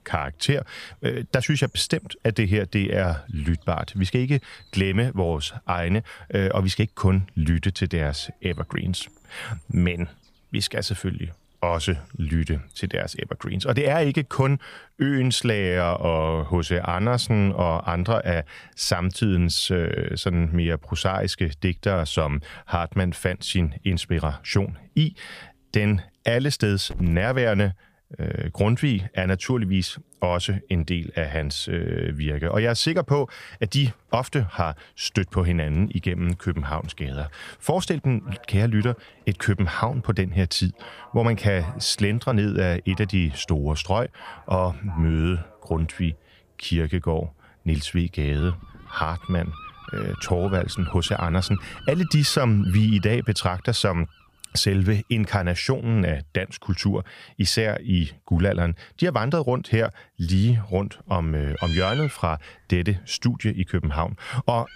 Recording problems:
animal sounds; noticeable; throughout; 20 dB below the speech

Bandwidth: 15 kHz